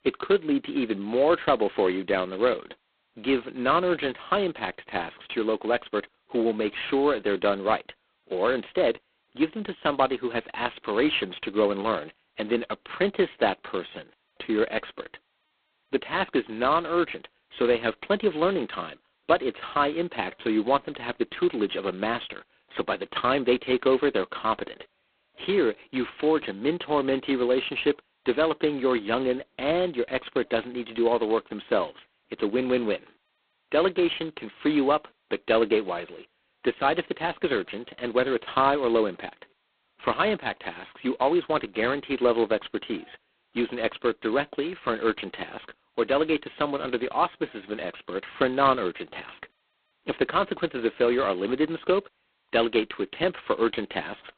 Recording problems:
phone-call audio; poor line; nothing above 4 kHz

